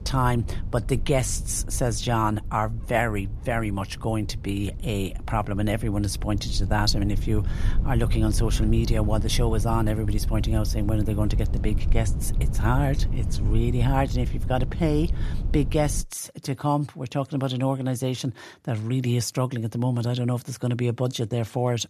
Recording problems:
low rumble; noticeable; until 16 s; 15 dB below the speech

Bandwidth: 14 kHz